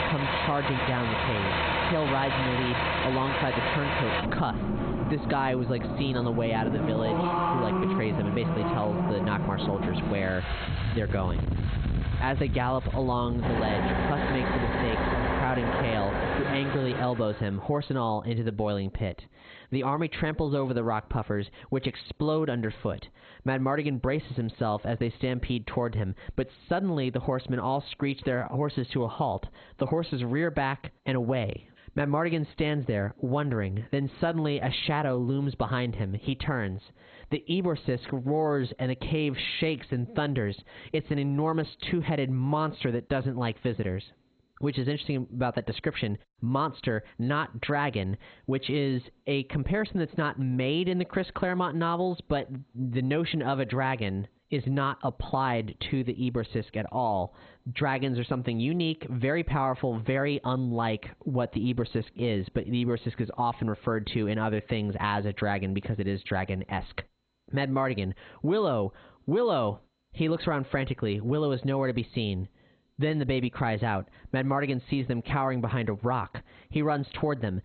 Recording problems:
garbled, watery; badly; nothing above 4 kHz
squashed, flat; heavily, background pumping
traffic noise; loud; until 17 s; as loud as the speech

